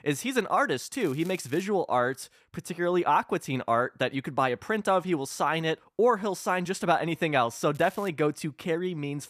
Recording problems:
crackling; faint; at 1 s and at 8 s; 25 dB below the speech

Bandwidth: 14.5 kHz